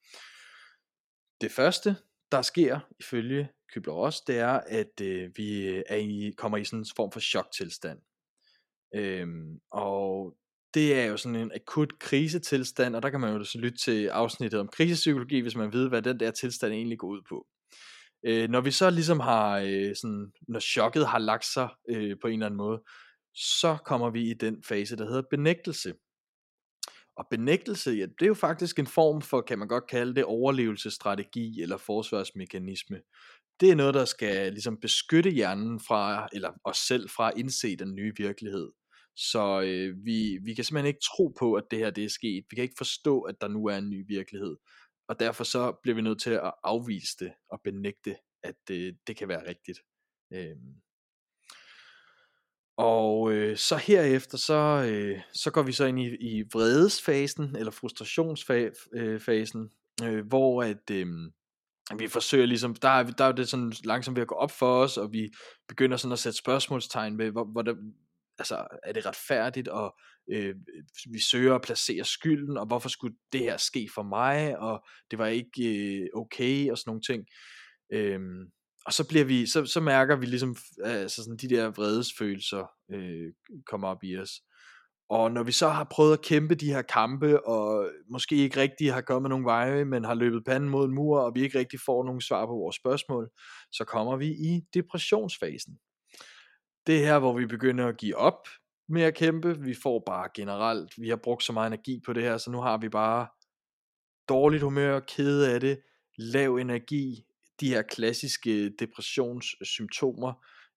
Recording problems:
none

